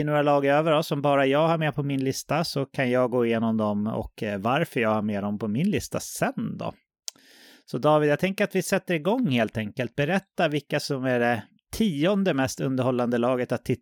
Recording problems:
abrupt cut into speech; at the start

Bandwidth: 18 kHz